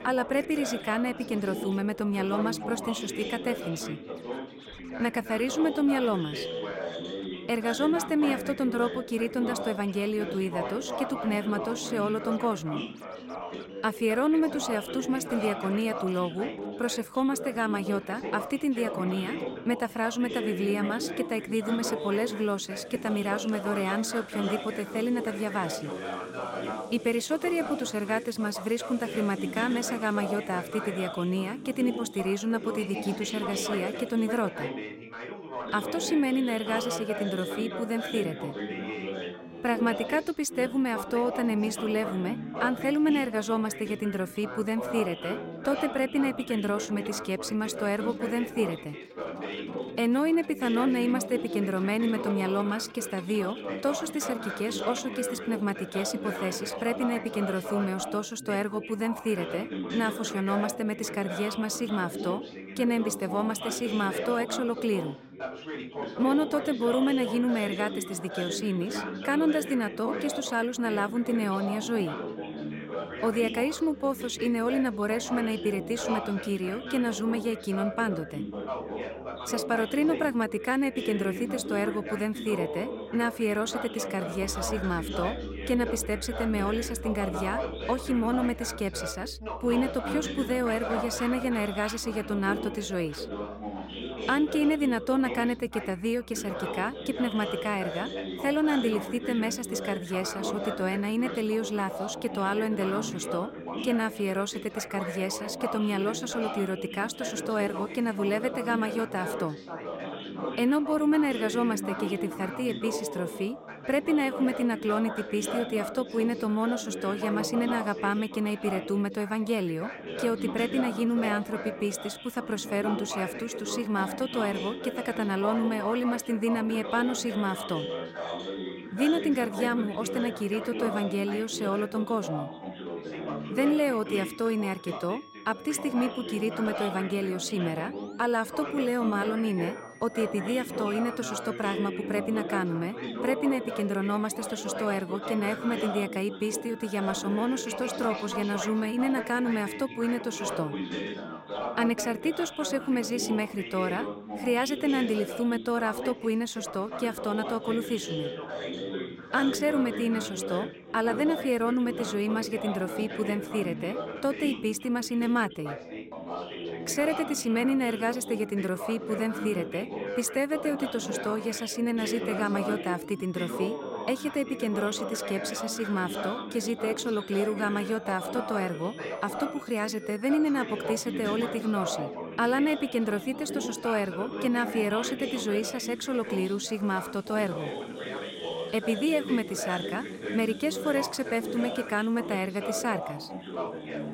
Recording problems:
background chatter; loud; throughout; 3 voices, 7 dB below the speech
background music; faint; throughout; 25 dB below the speech

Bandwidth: 16 kHz